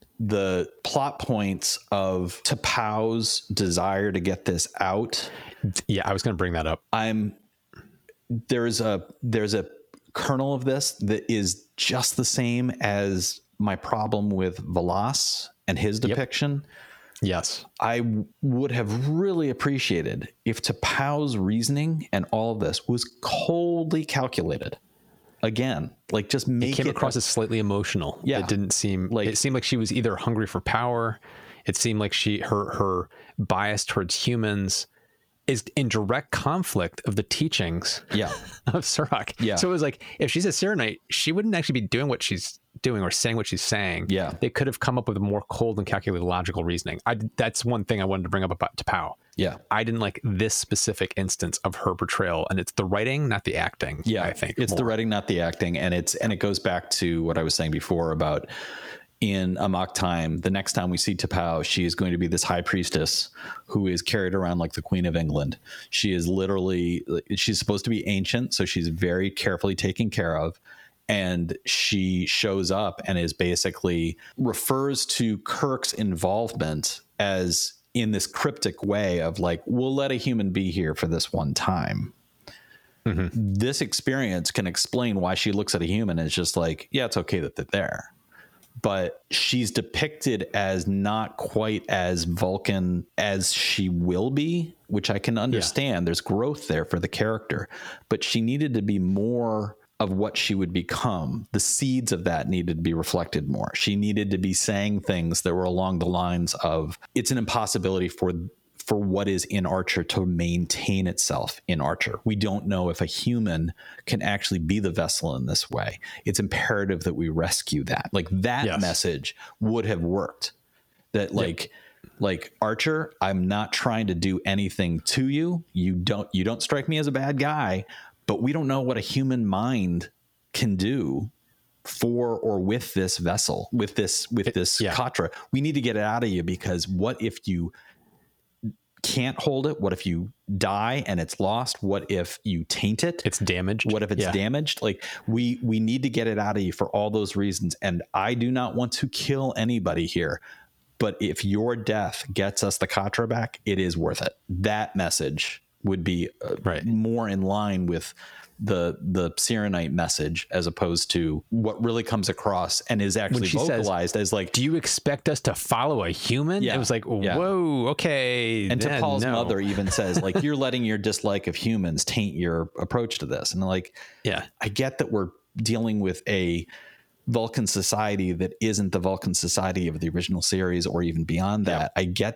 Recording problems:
squashed, flat; heavily

